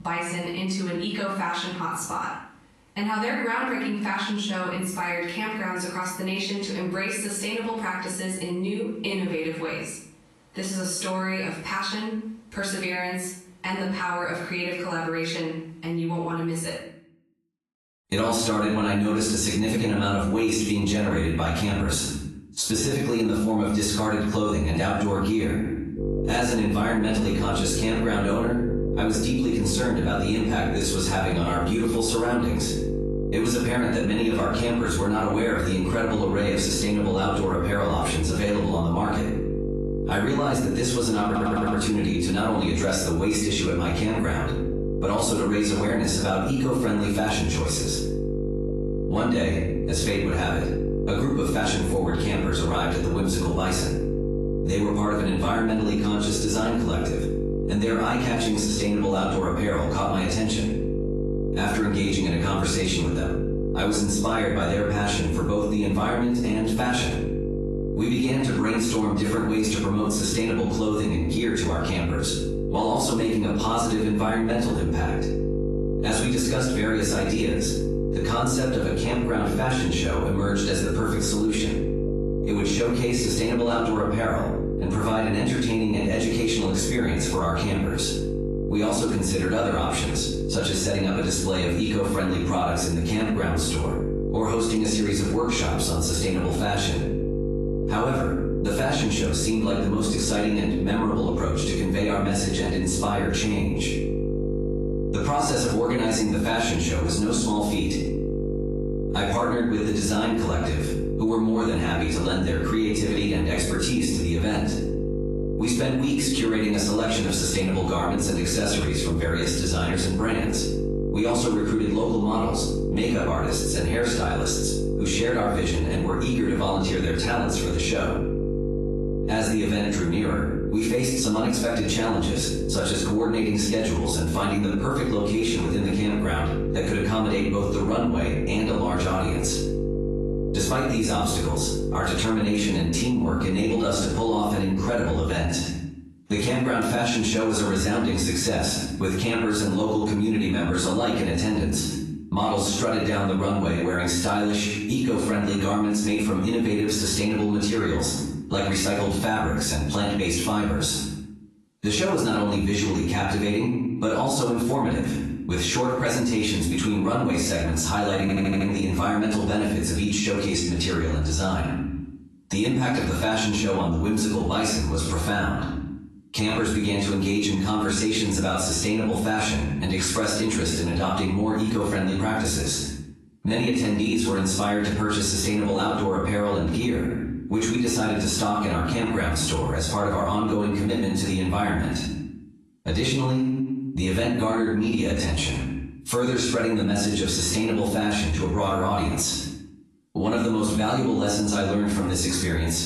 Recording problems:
off-mic speech; far
room echo; noticeable; dies away in 0.5 s
garbled, watery; slightly; nothing above 11.5 kHz
squashed, flat; somewhat
electrical hum; loud; from 26 s to 2:25; 50 Hz, 8 dB below the speech
audio stuttering; at 41 s and at 2:48

